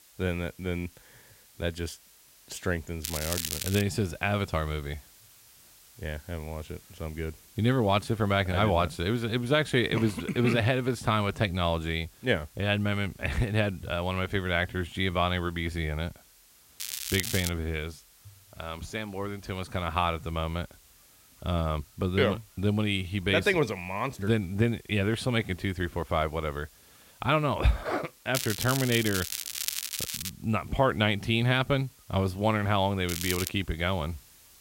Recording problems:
crackling; loud; 4 times, first at 3 s; 4 dB below the speech
hiss; faint; throughout; 25 dB below the speech

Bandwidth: 16 kHz